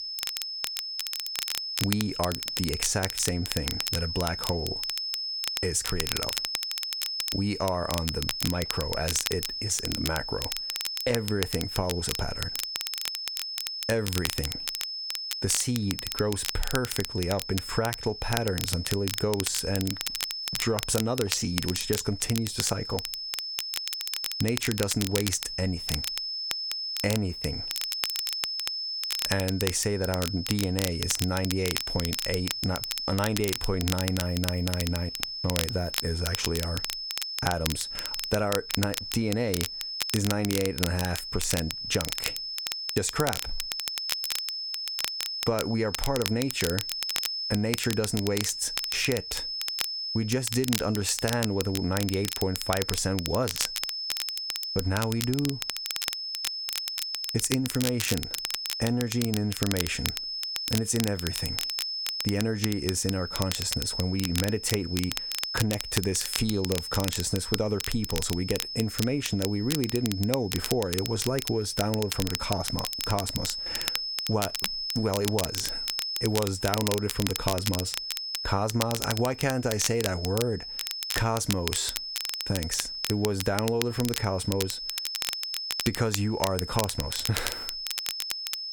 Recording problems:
squashed, flat; somewhat
high-pitched whine; loud; throughout; 5 kHz, 4 dB below the speech
crackle, like an old record; loud; 5 dB below the speech

